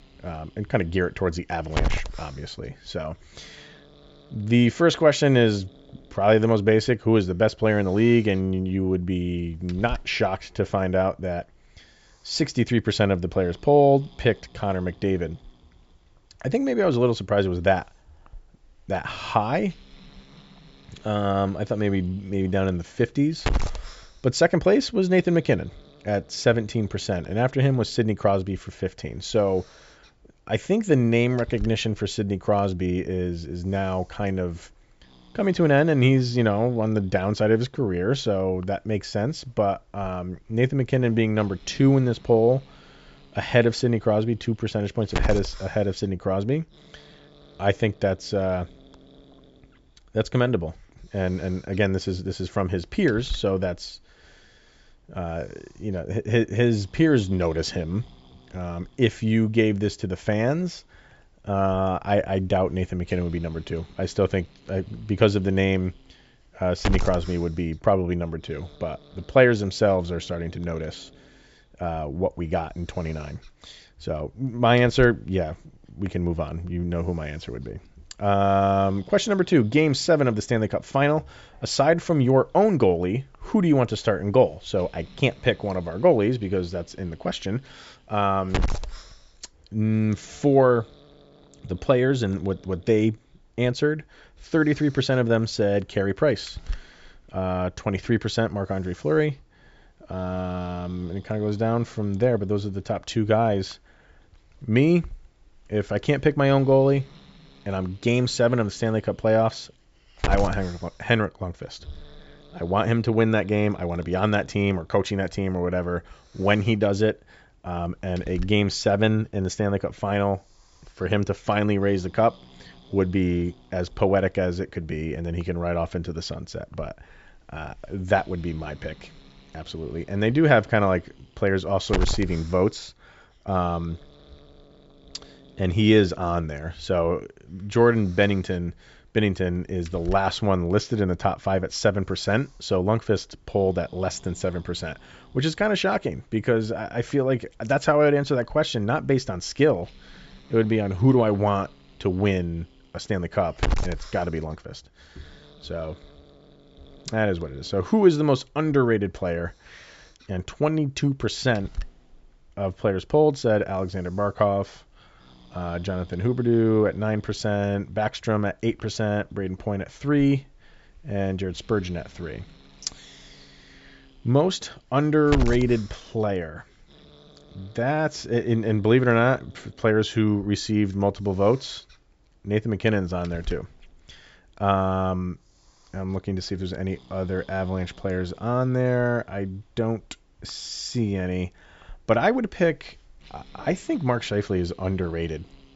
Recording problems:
high frequencies cut off; noticeable; nothing above 8 kHz
hiss; noticeable; throughout; 15 dB below the speech

